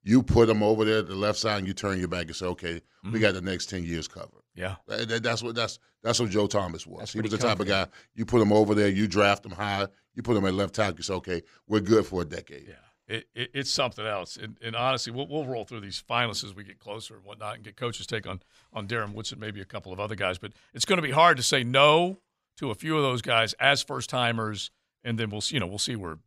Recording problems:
none

